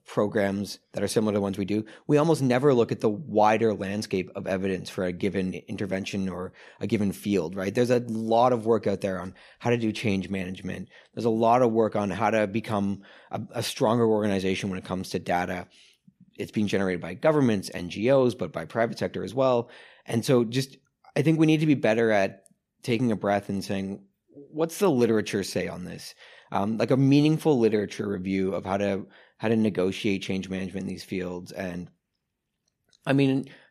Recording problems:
none

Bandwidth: 14.5 kHz